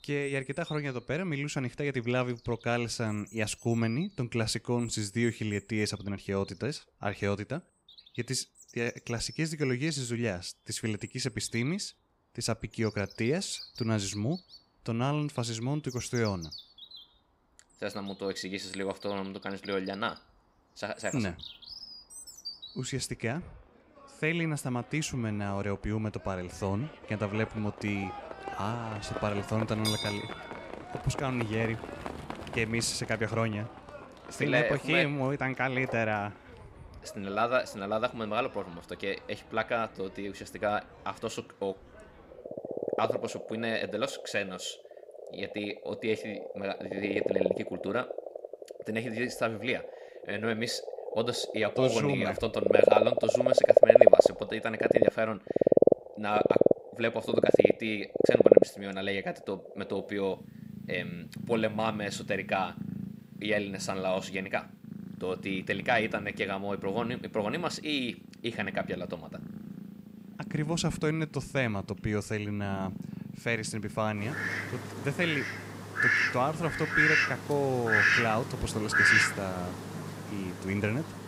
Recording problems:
animal sounds; very loud; throughout; 4 dB above the speech

